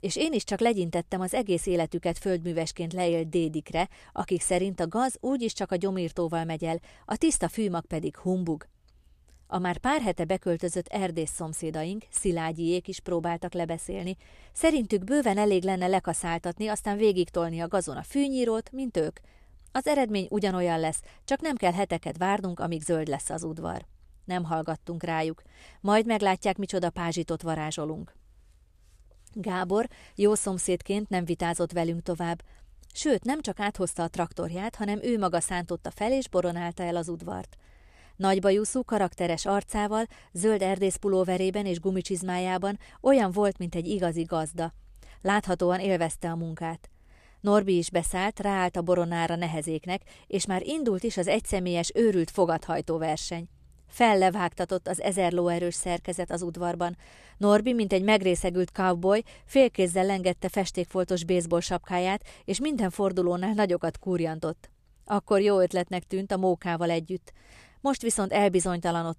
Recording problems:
none

